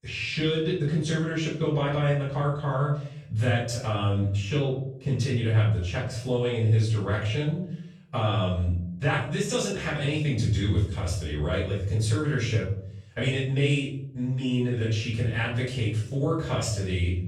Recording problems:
off-mic speech; far
room echo; noticeable; dies away in 0.6 s

